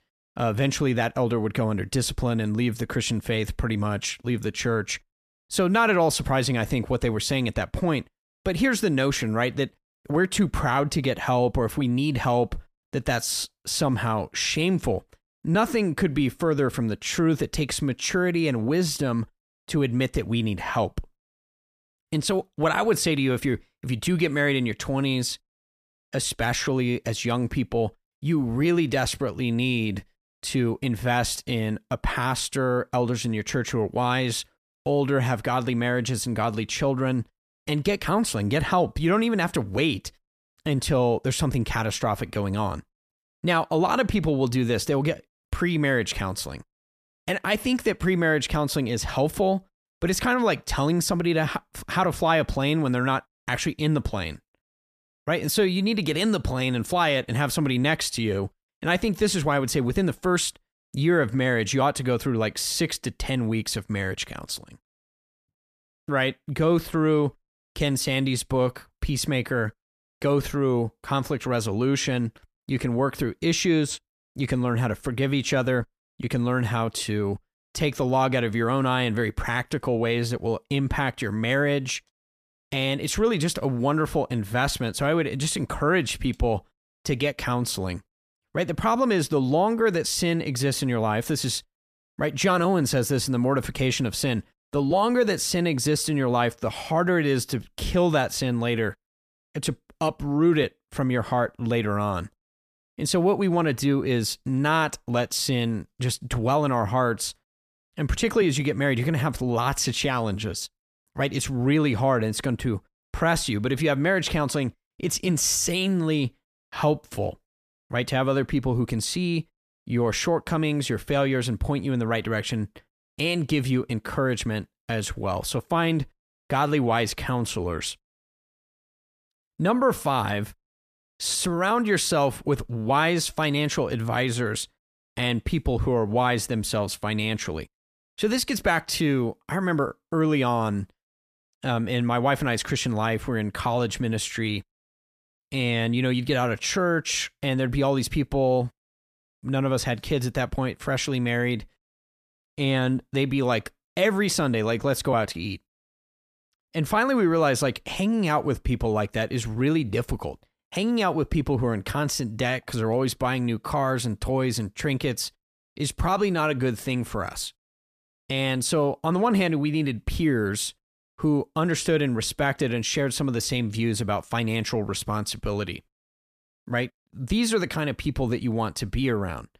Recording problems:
none

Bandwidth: 14.5 kHz